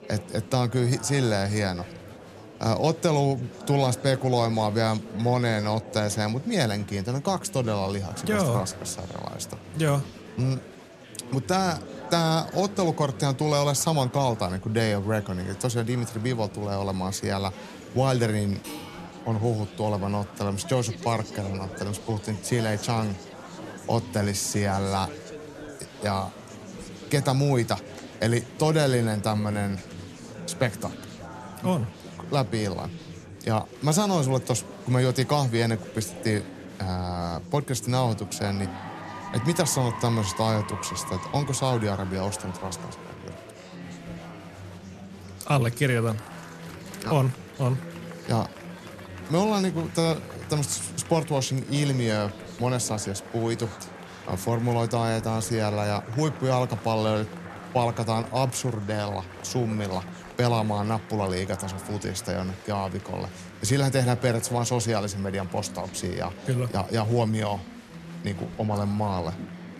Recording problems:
chatter from many people; noticeable; throughout; 15 dB below the speech
clattering dishes; faint; at 19 s; peak 10 dB below the speech

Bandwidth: 13.5 kHz